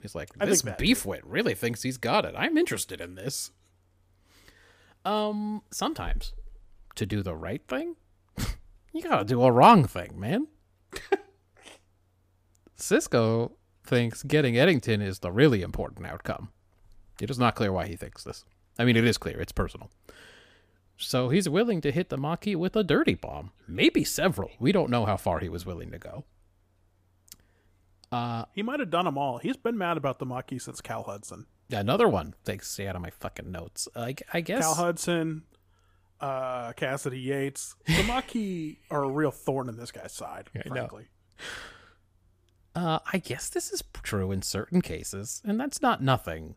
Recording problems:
none

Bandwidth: 15 kHz